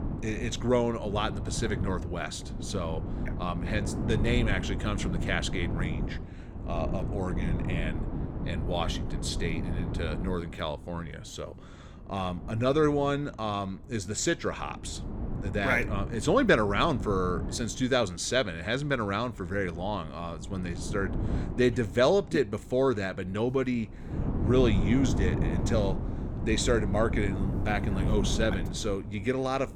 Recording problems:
wind noise on the microphone; occasional gusts; 10 dB below the speech

